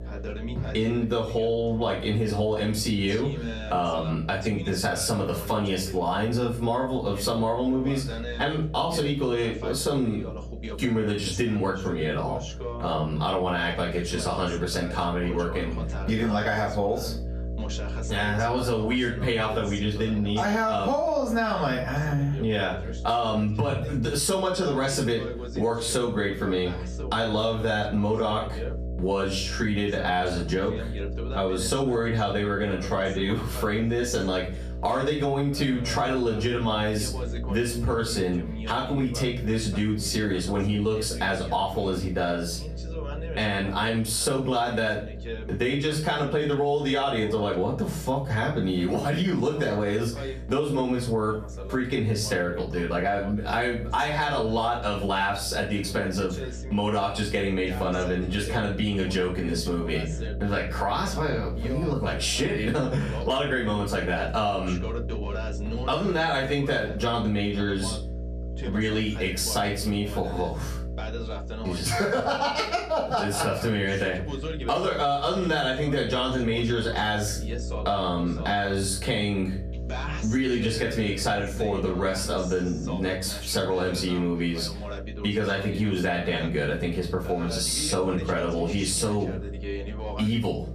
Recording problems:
off-mic speech; far
room echo; slight; dies away in 0.4 s
squashed, flat; somewhat
voice in the background; noticeable; throughout; 15 dB below the speech
electrical hum; faint; throughout; 60 Hz, 20 dB below the speech

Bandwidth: 14.5 kHz